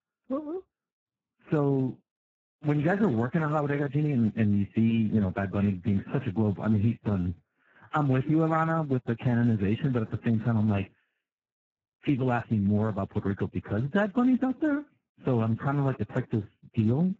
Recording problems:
garbled, watery; badly; nothing above 7.5 kHz

